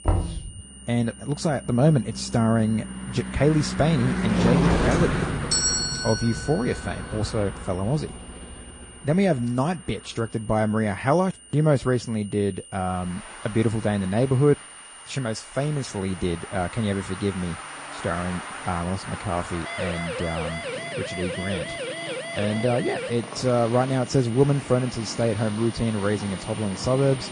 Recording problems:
garbled, watery; slightly
traffic noise; loud; throughout; 8 dB below the speech
high-pitched whine; noticeable; throughout; 9 kHz, 20 dB below the speech
door banging; noticeable; at the start; peak 1 dB below the speech
doorbell; loud; from 4.5 to 8 s; peak 5 dB above the speech
siren; noticeable; from 20 to 23 s; peak 6 dB below the speech

